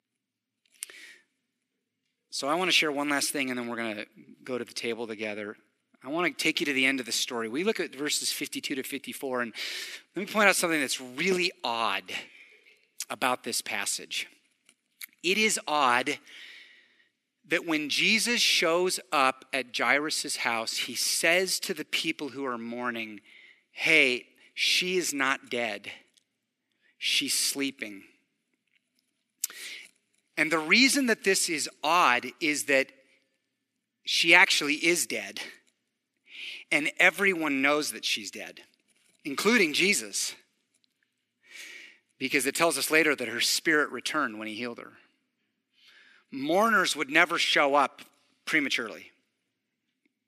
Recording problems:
thin; somewhat; fading below 400 Hz

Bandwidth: 14.5 kHz